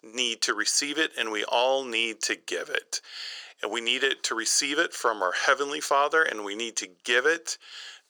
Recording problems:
thin; very; fading below 500 Hz

